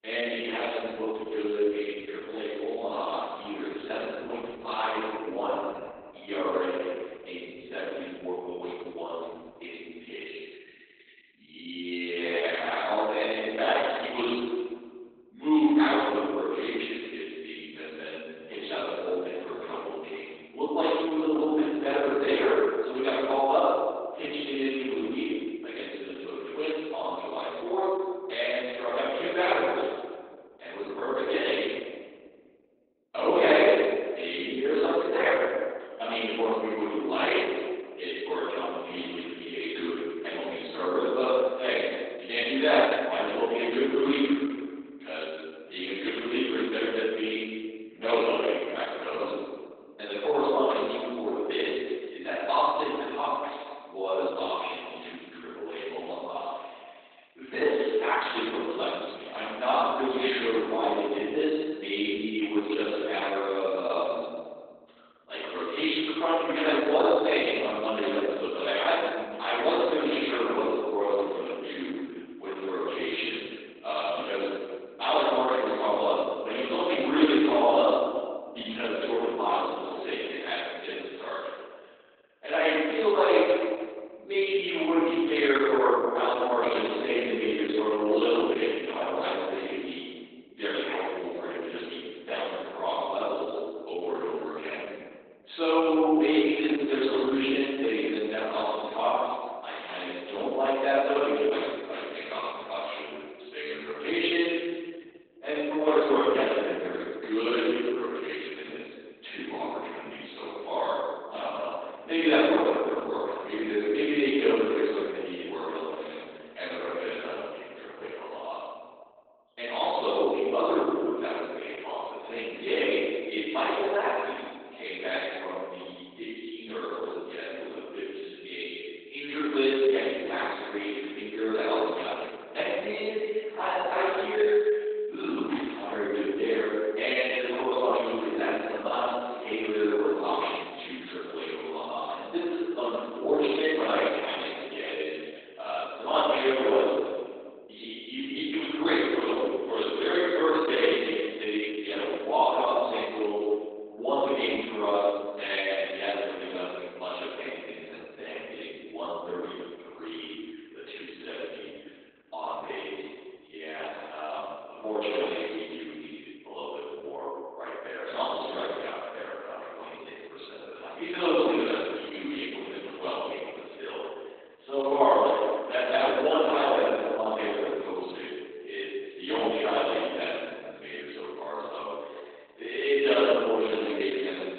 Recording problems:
room echo; strong; dies away in 1.4 s
off-mic speech; far
garbled, watery; badly; nothing above 4 kHz
thin; very slightly; fading below 300 Hz

